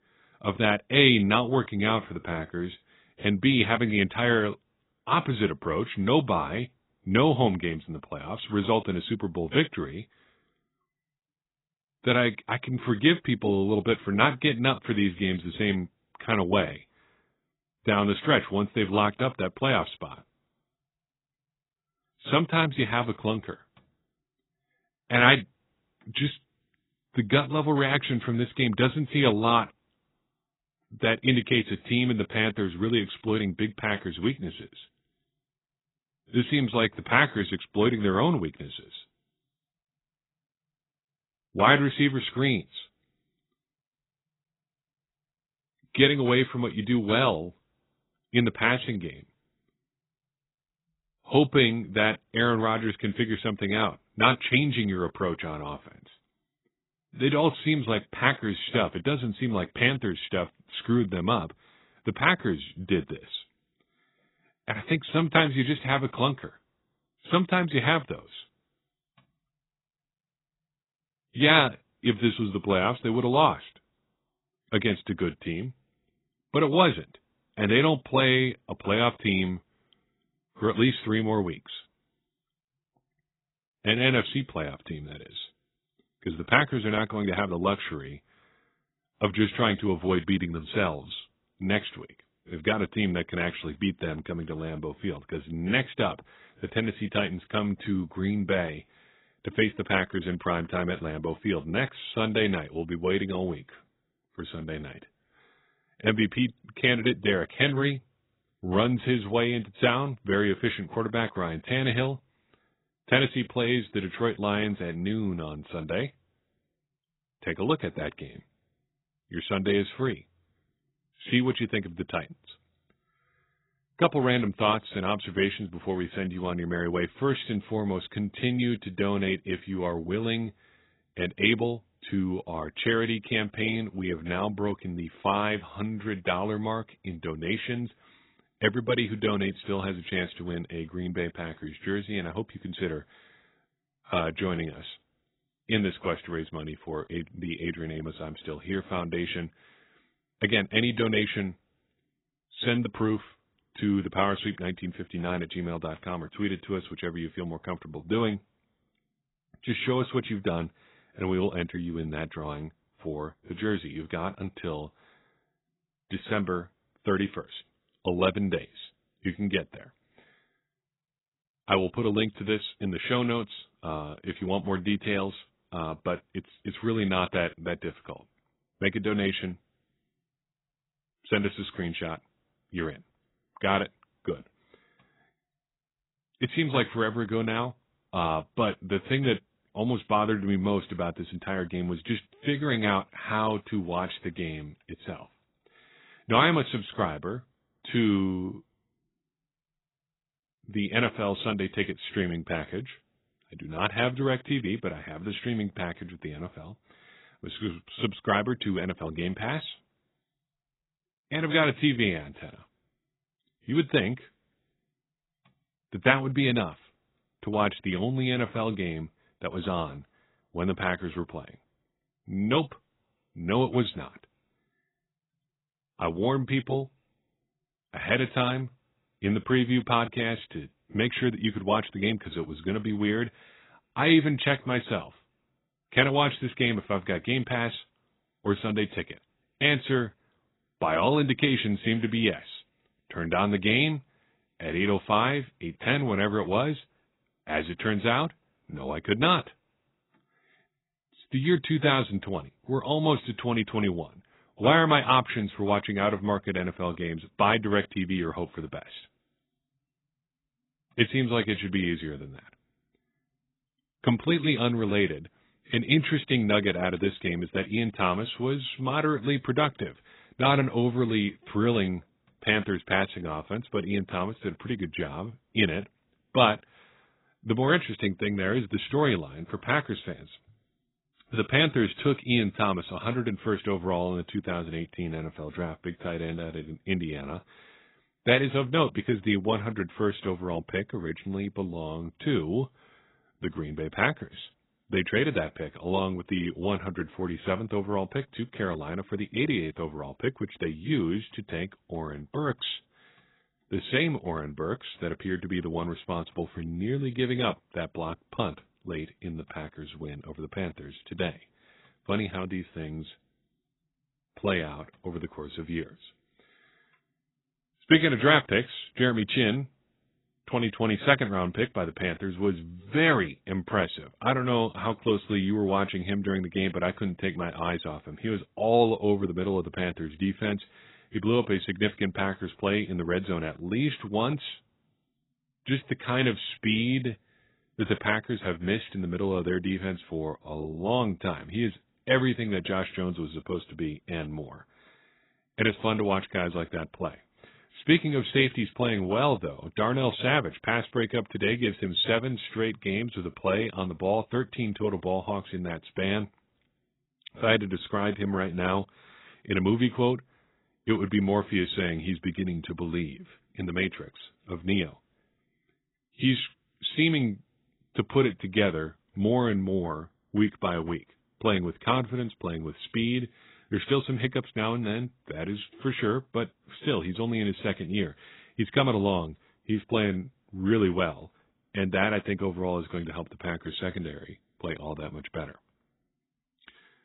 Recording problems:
garbled, watery; badly; nothing above 4 kHz

